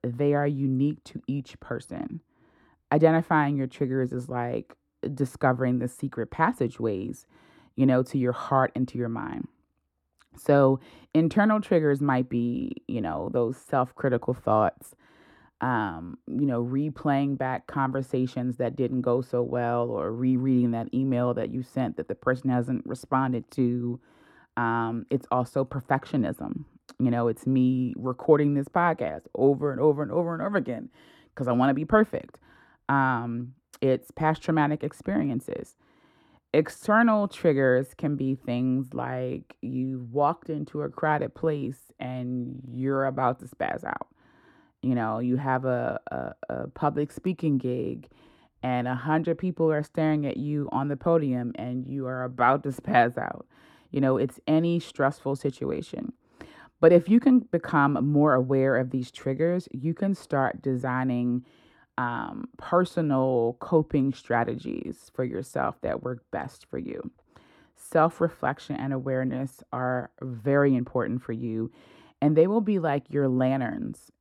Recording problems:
muffled; slightly; fading above 1.5 kHz

